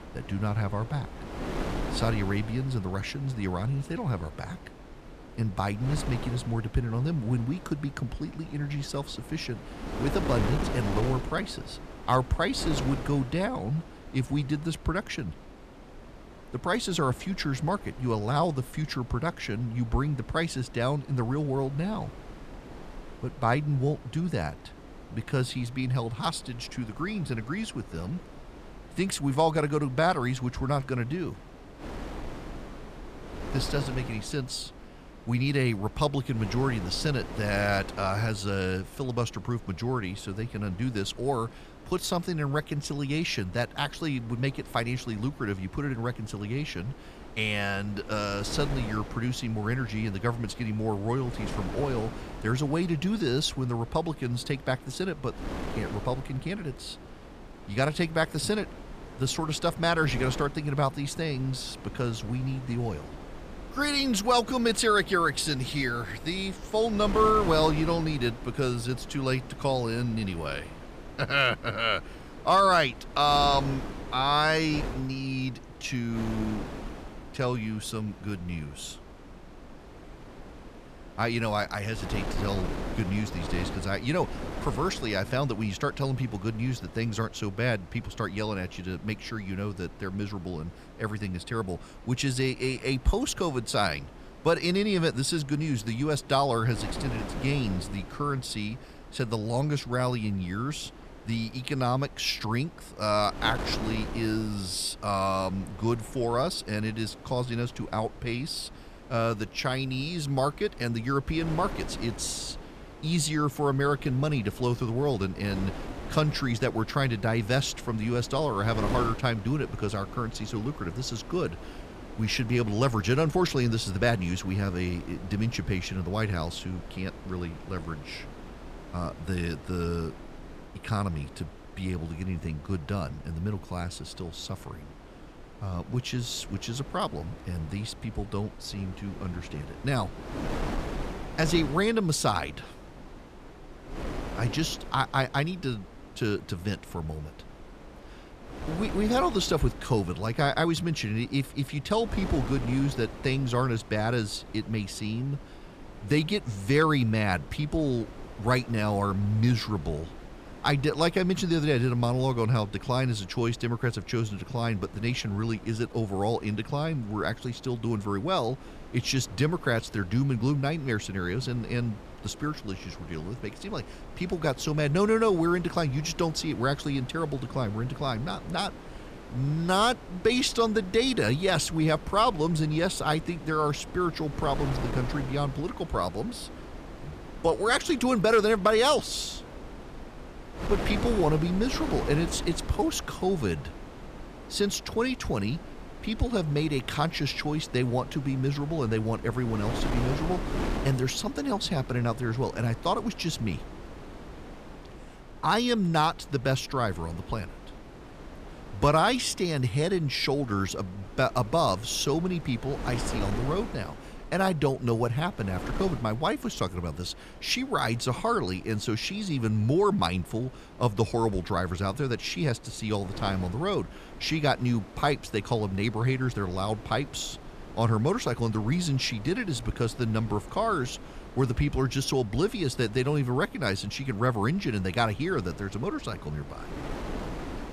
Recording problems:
wind noise on the microphone; occasional gusts; 15 dB below the speech

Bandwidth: 14.5 kHz